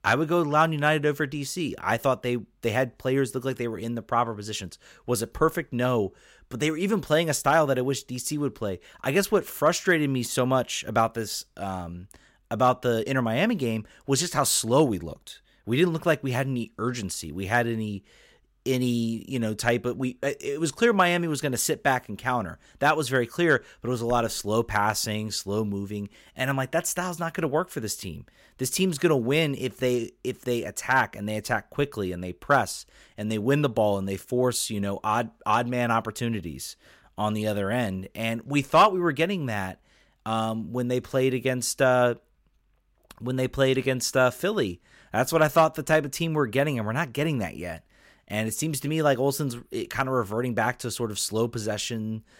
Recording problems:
none

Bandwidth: 16 kHz